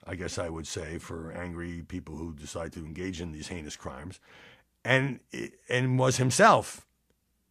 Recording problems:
none

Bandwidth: 14.5 kHz